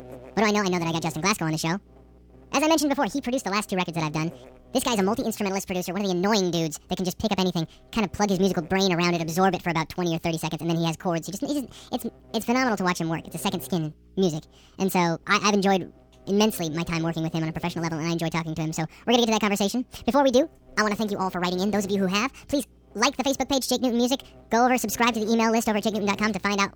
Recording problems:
wrong speed and pitch; too fast and too high; 1.6 times normal speed
electrical hum; faint; throughout; 60 Hz, 25 dB below the speech

